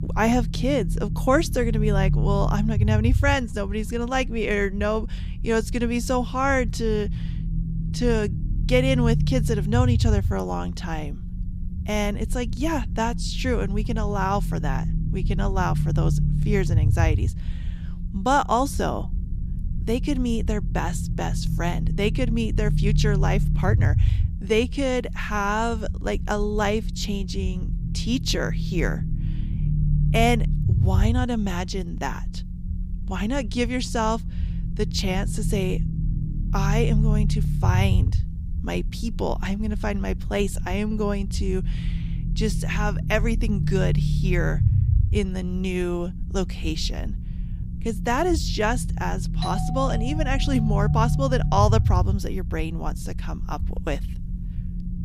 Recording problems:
low rumble; noticeable; throughout; 10 dB below the speech
doorbell; noticeable; from 49 to 51 s; peak 6 dB below the speech

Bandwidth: 15.5 kHz